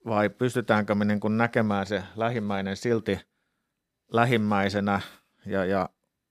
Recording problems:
none

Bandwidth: 15 kHz